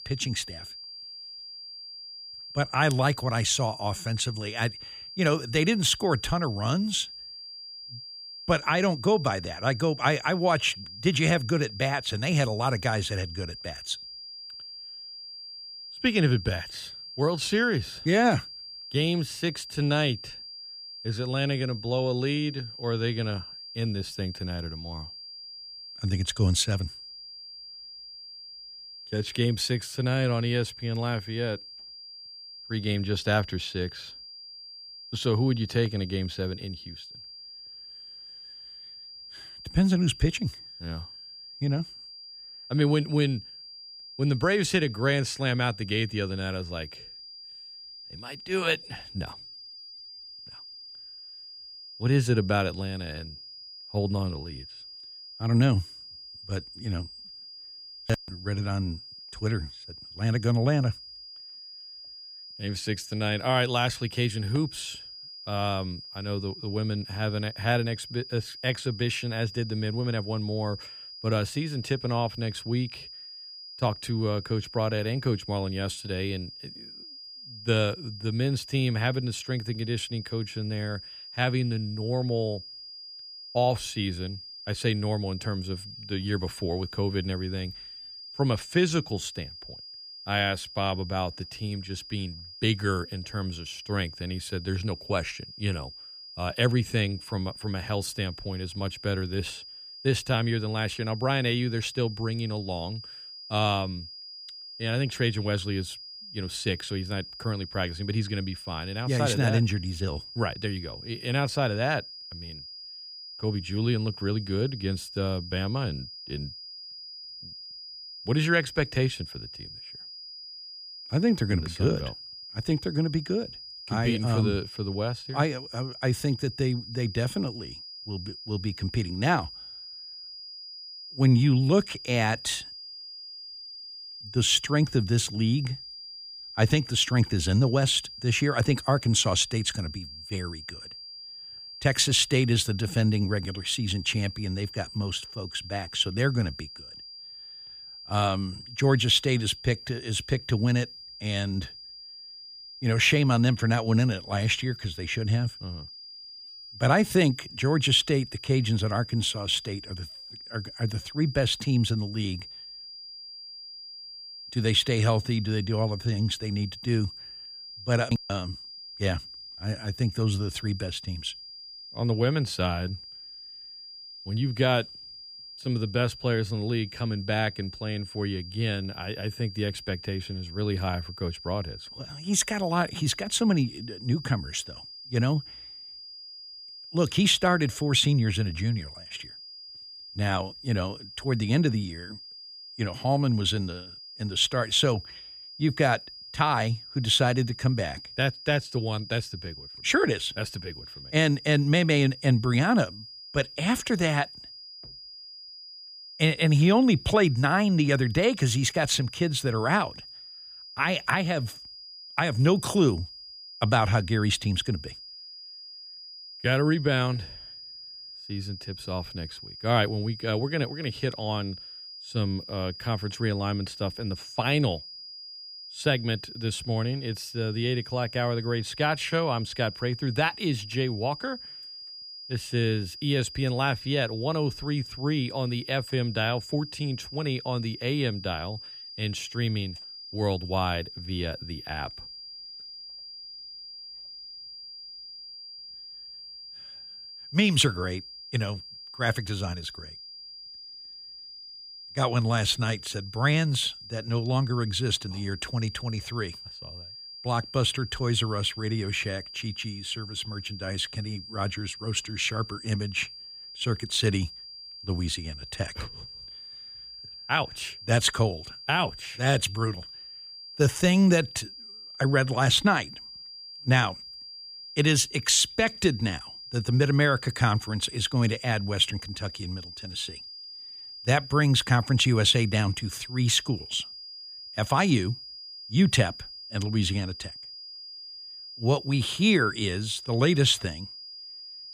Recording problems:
high-pitched whine; noticeable; throughout; 5 kHz, 15 dB below the speech

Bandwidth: 15 kHz